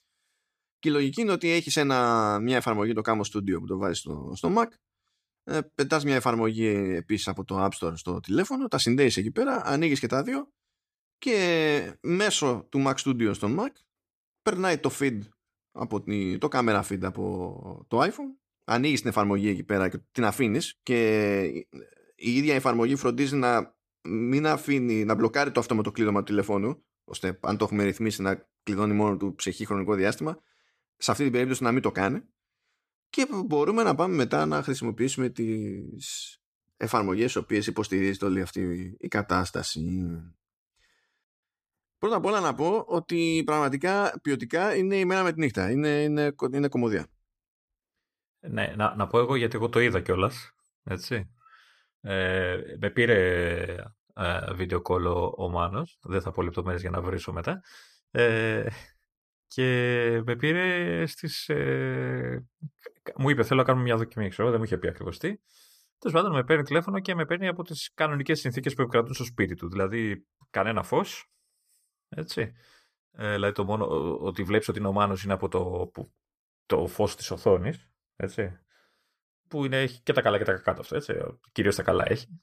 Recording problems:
none

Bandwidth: 14.5 kHz